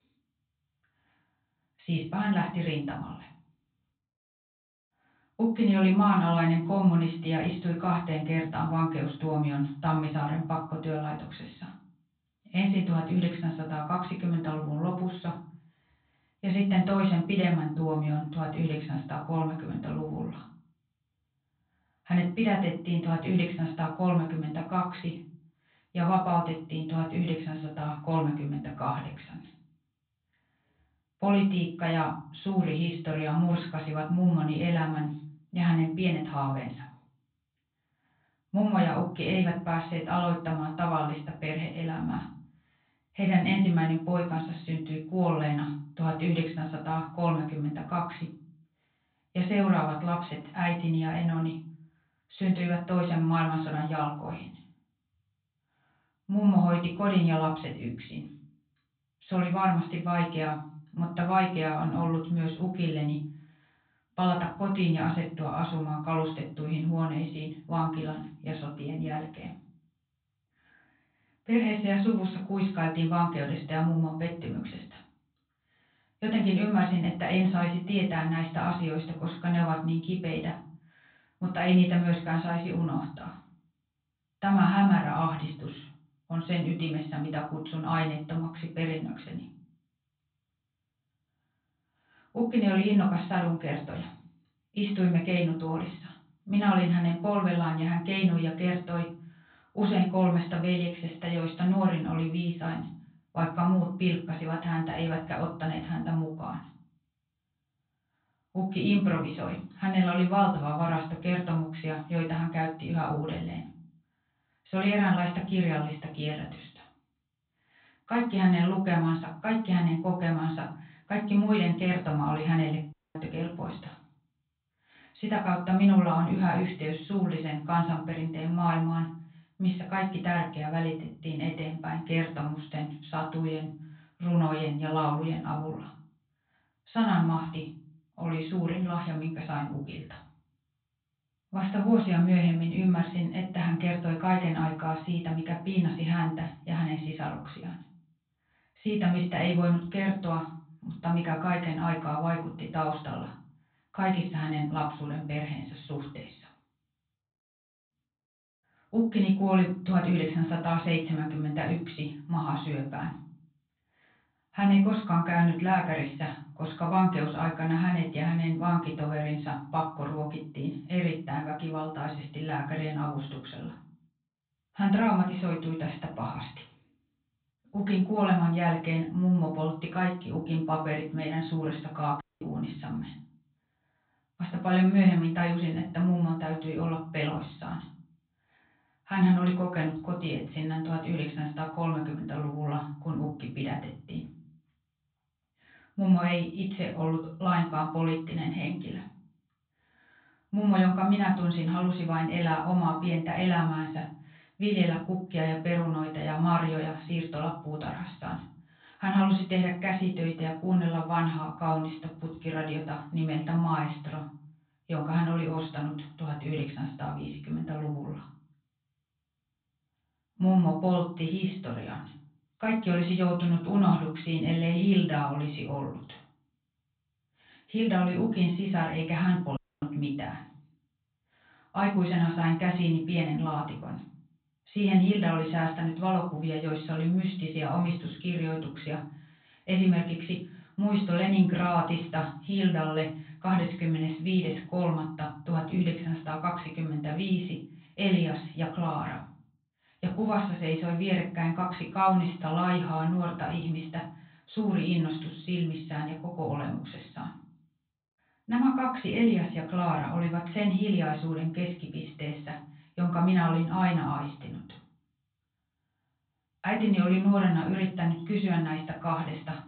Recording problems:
off-mic speech; far
high frequencies cut off; severe; nothing above 4 kHz
room echo; slight; dies away in 0.4 s
audio cutting out; at 2:03, at 3:02 and at 3:50

